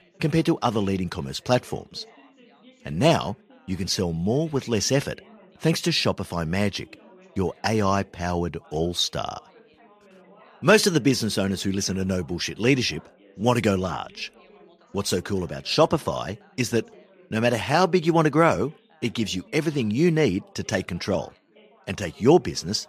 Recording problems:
background chatter; faint; throughout; 3 voices, 30 dB below the speech

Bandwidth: 15 kHz